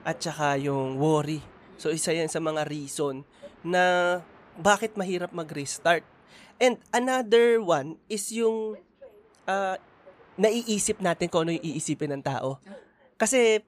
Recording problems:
train or aircraft noise; faint; throughout; 25 dB below the speech

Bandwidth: 14.5 kHz